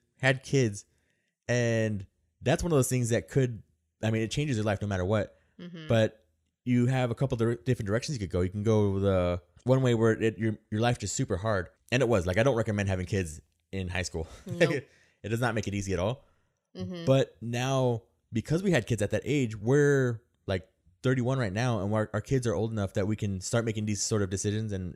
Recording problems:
none

